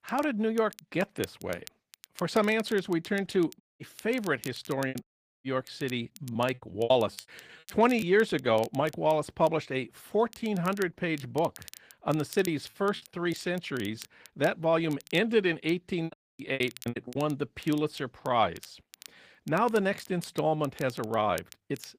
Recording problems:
garbled, watery; slightly; nothing above 15 kHz
crackle, like an old record; faint; 20 dB below the speech
audio cutting out; at 3.5 s, at 5 s and at 16 s
choppy; very; from 5 to 8 s, from 12 to 14 s and from 16 to 17 s; 16% of the speech affected

